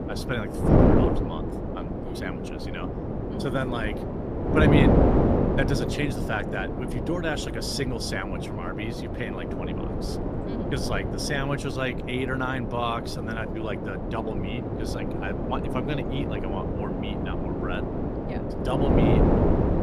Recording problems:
wind noise on the microphone; heavy; 1 dB above the speech

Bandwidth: 15 kHz